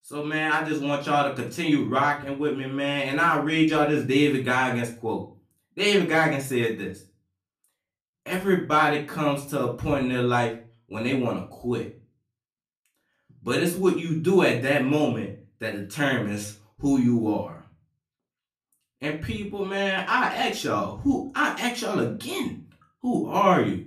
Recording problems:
off-mic speech; far
room echo; slight; dies away in 0.3 s

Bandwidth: 14.5 kHz